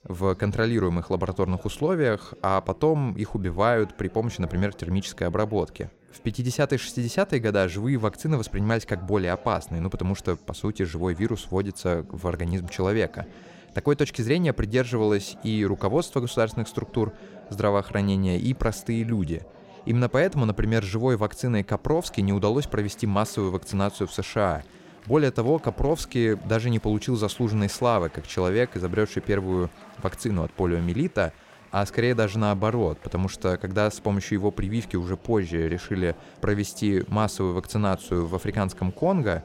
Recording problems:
chatter from many people; faint; throughout; 20 dB below the speech

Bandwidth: 16 kHz